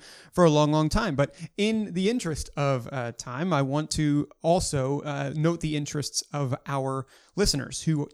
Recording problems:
none

